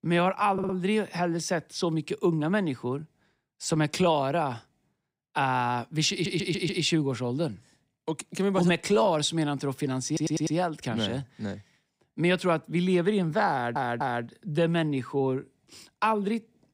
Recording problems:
audio stuttering; 4 times, first at 0.5 s

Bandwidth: 15.5 kHz